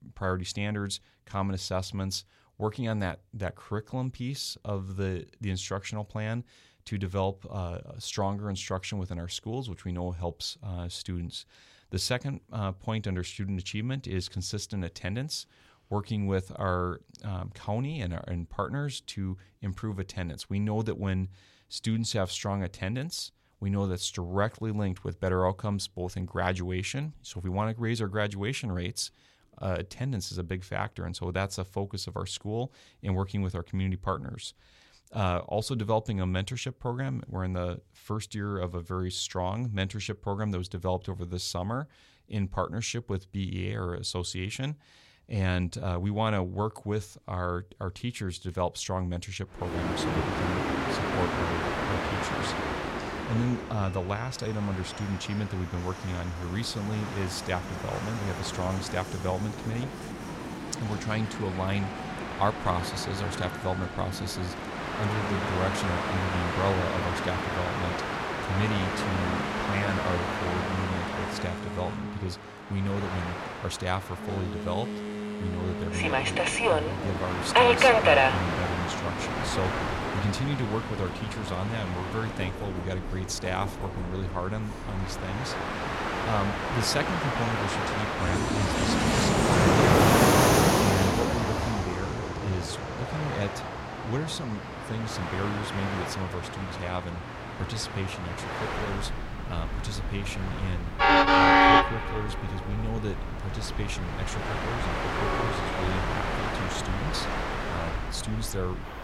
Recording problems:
train or aircraft noise; very loud; from 50 s on; 5 dB above the speech

